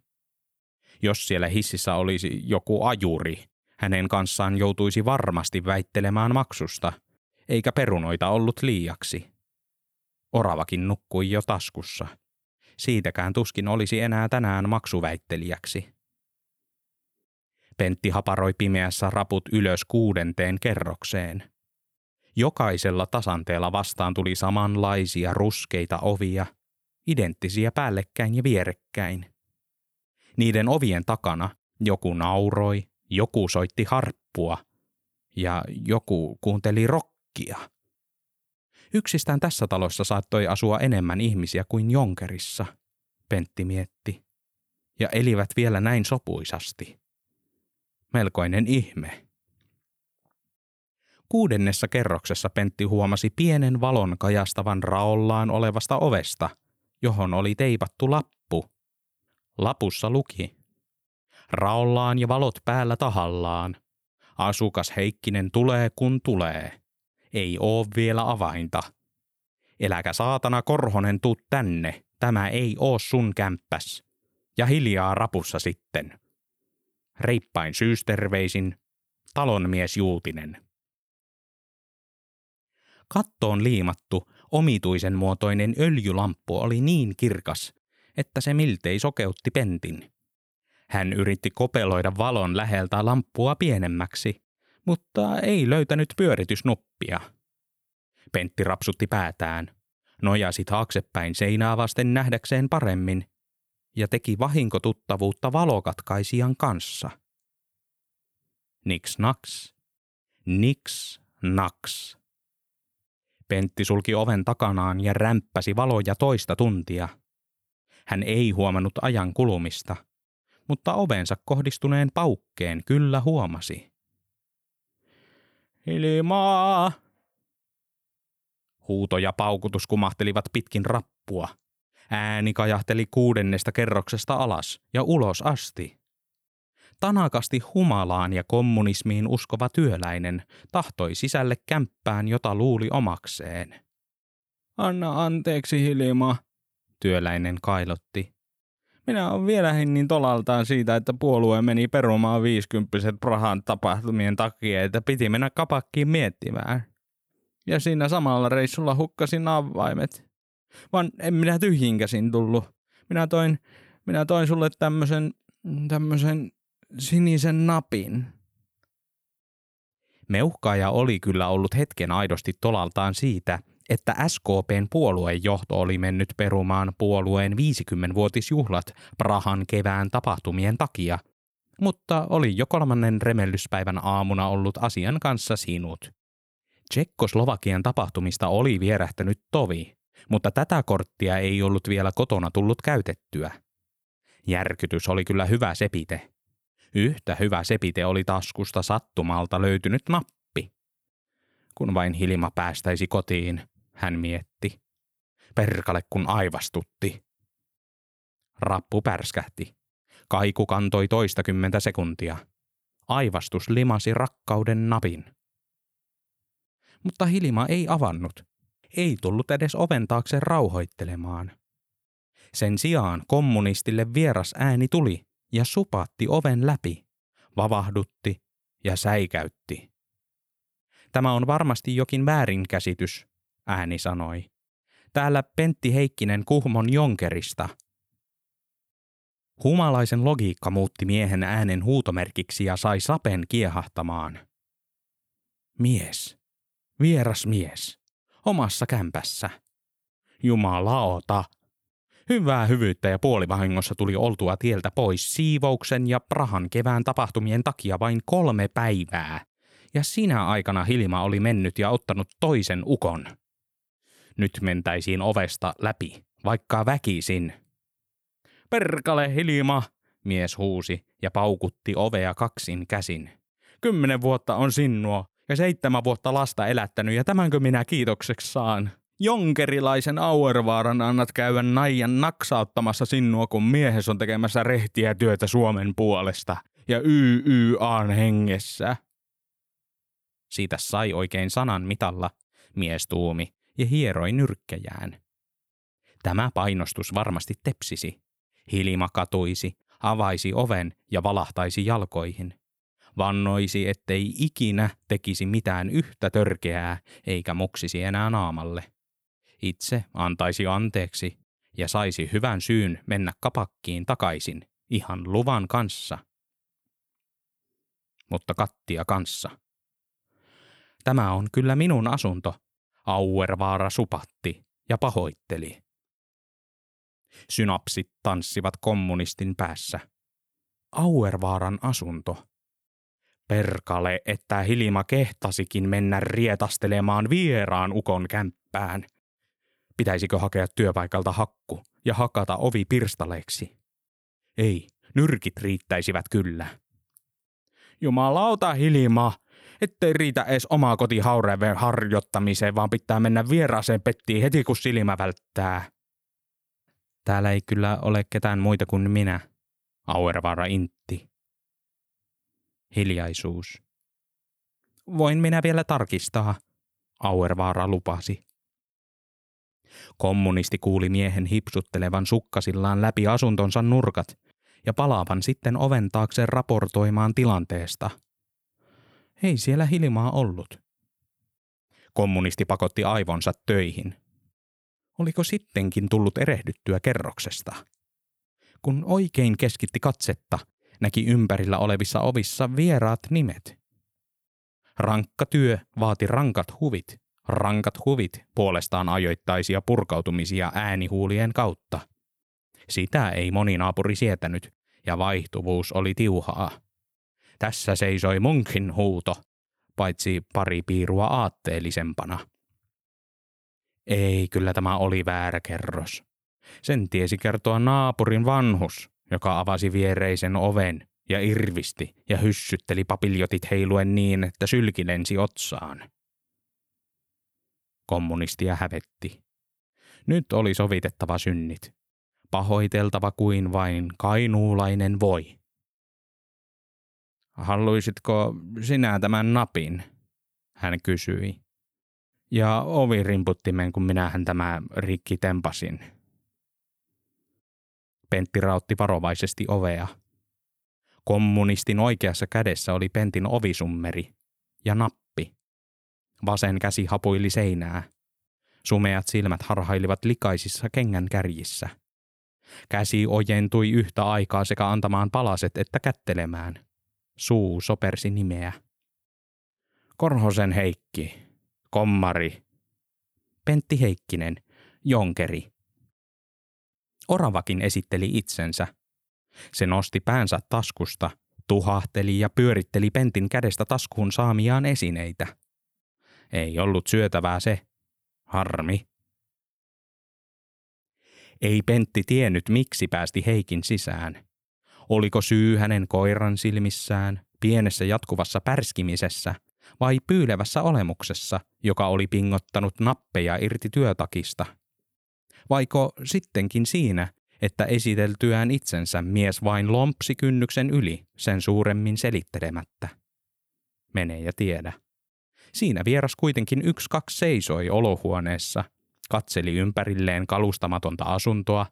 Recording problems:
none

